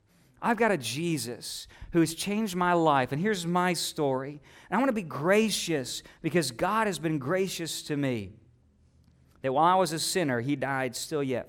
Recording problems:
none

